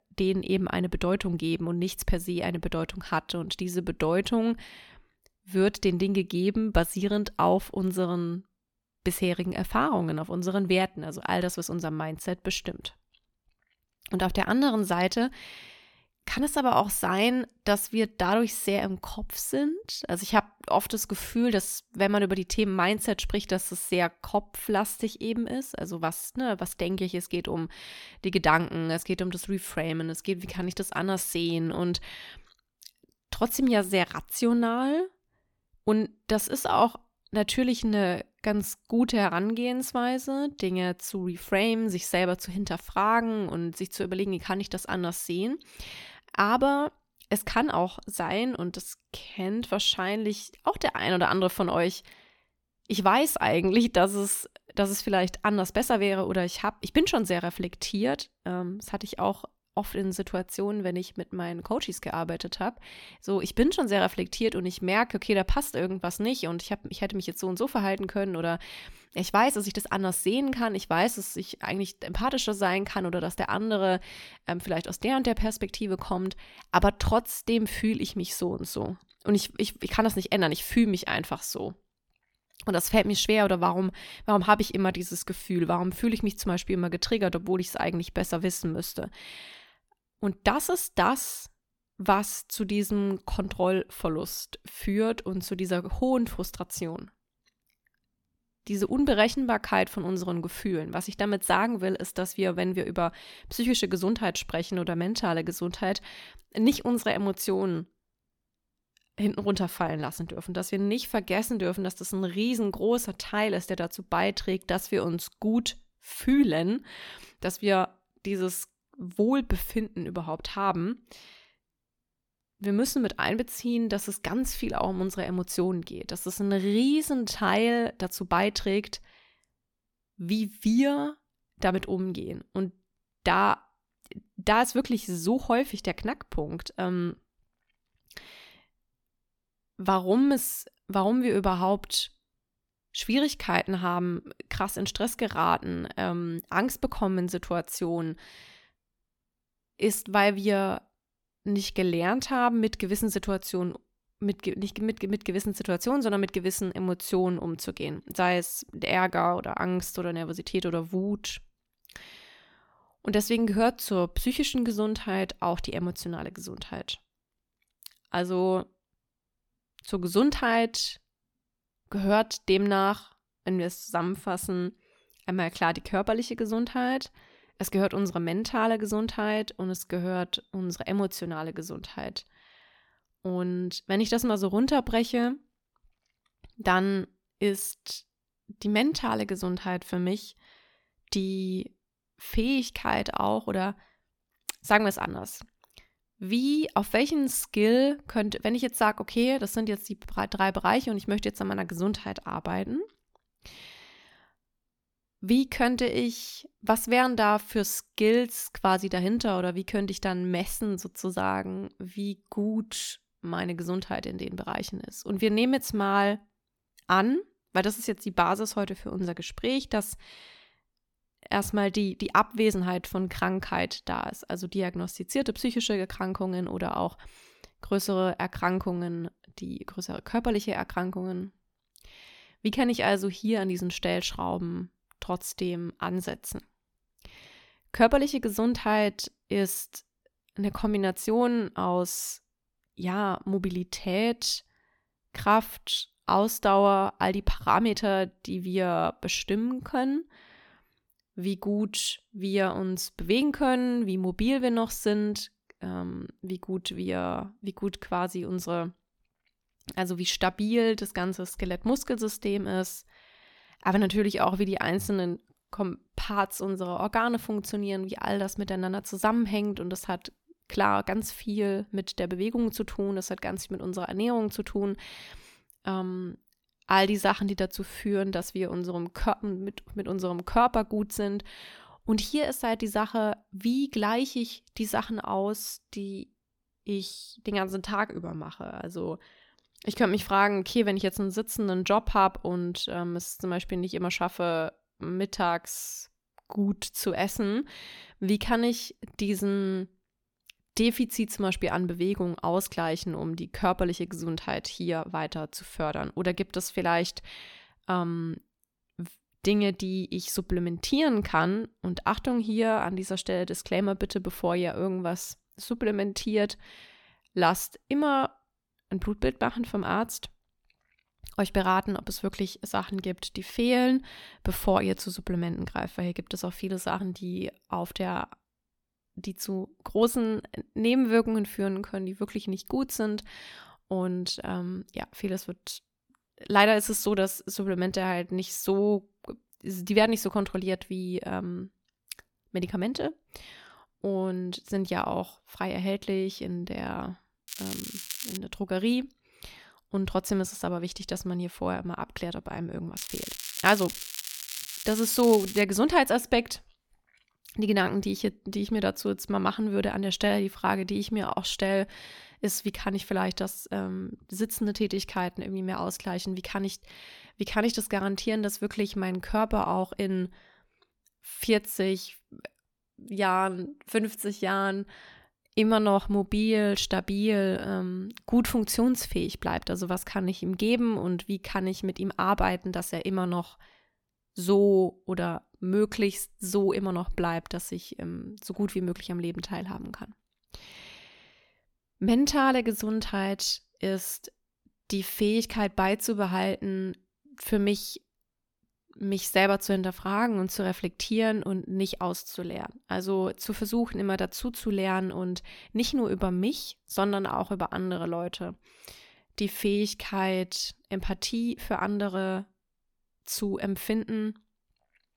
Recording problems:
crackling; loud; at 5:47 and from 5:53 to 5:55; 8 dB below the speech

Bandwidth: 18 kHz